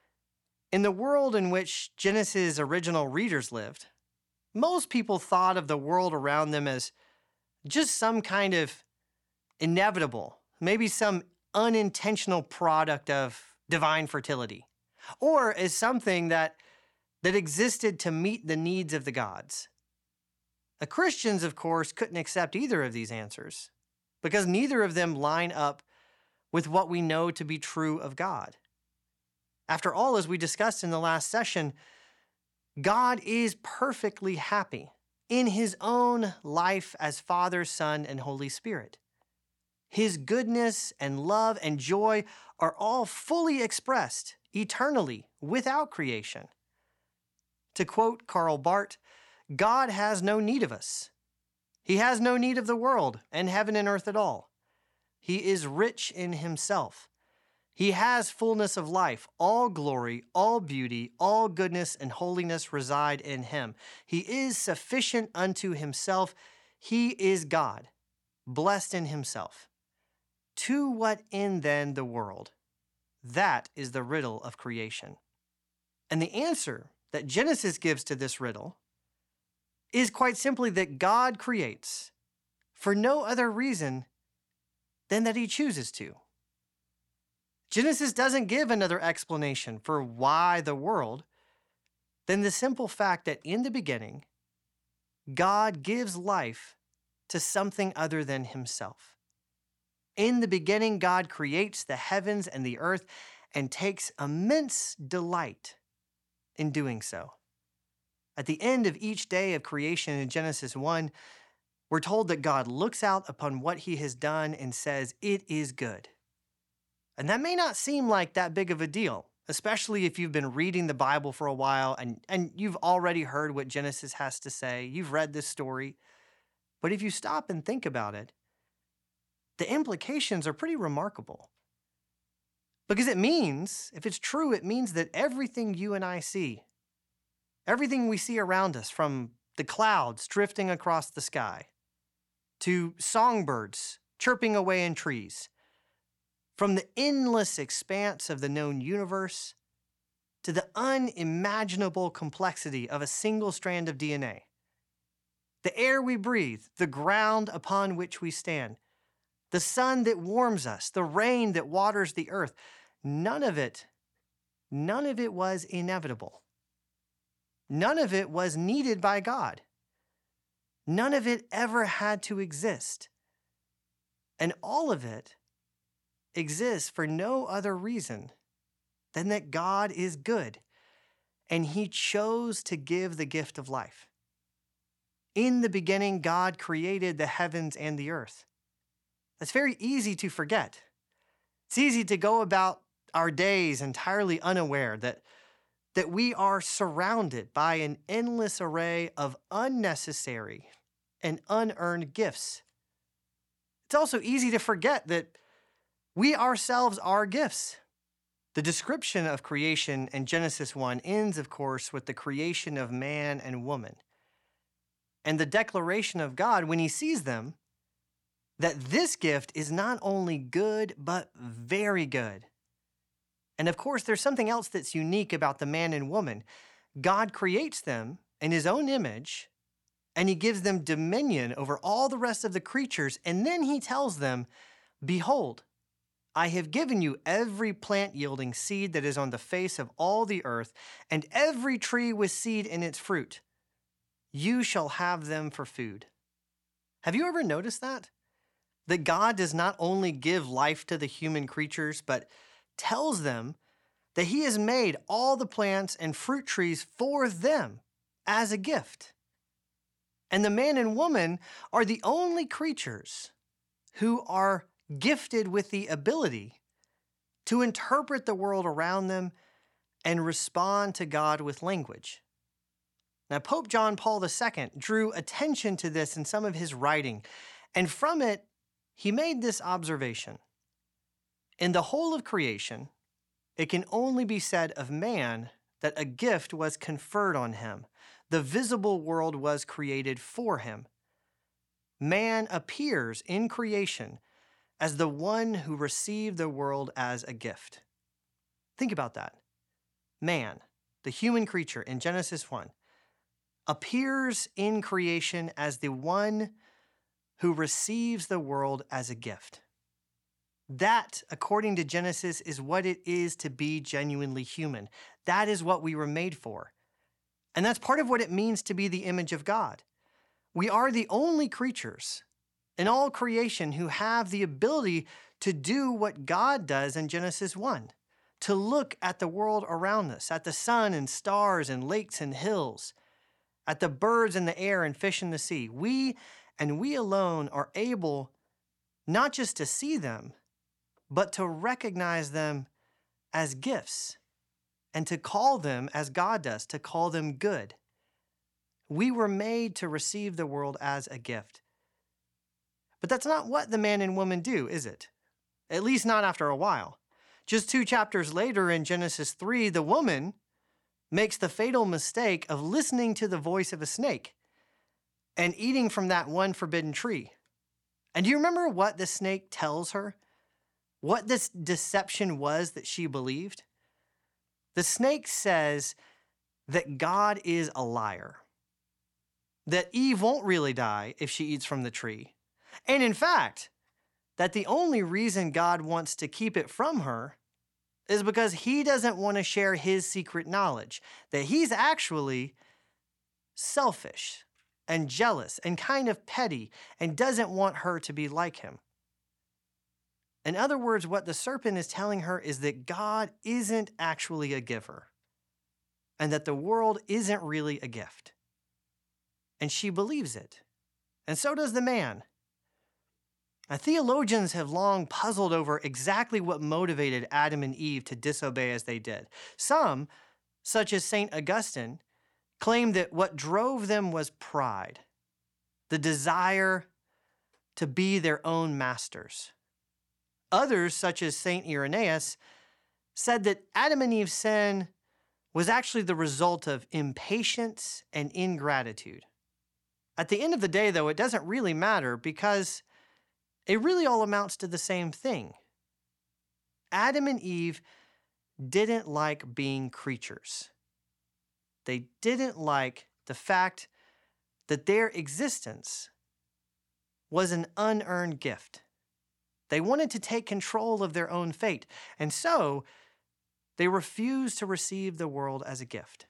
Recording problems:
none

